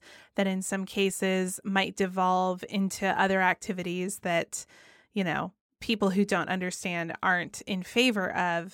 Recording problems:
none

